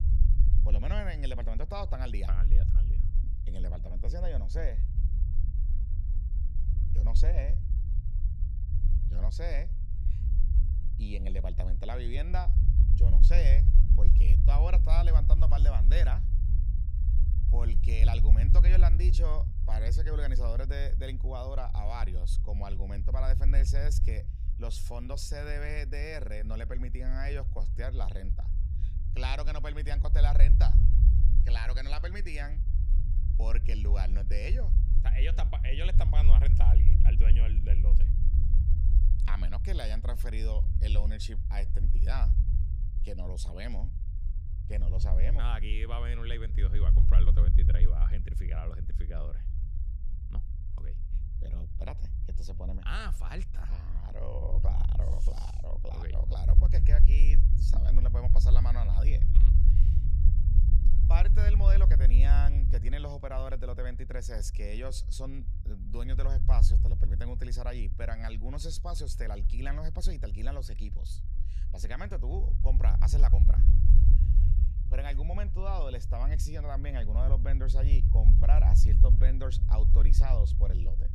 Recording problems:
low rumble; loud; throughout; 7 dB below the speech

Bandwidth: 15 kHz